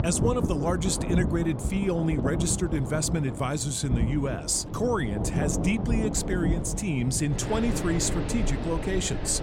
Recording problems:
rain or running water; loud; throughout; 3 dB below the speech

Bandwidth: 16 kHz